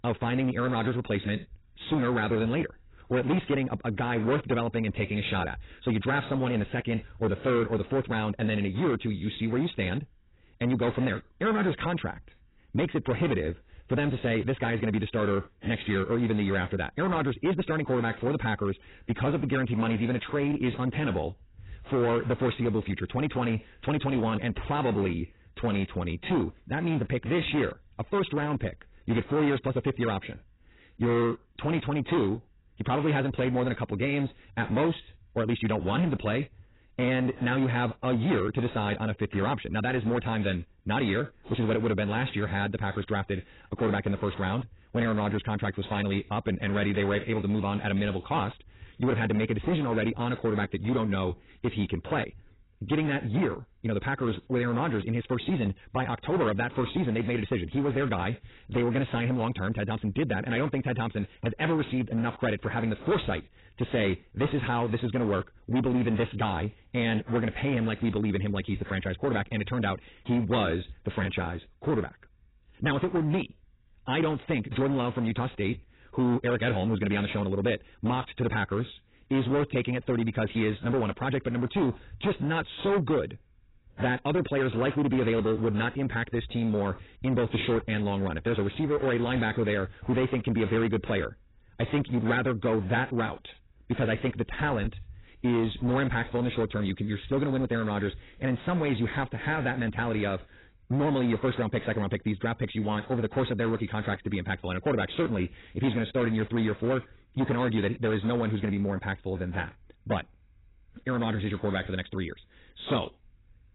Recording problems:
garbled, watery; badly; nothing above 4 kHz
wrong speed, natural pitch; too fast; 1.5 times normal speed
distortion; slight; 10% of the sound clipped

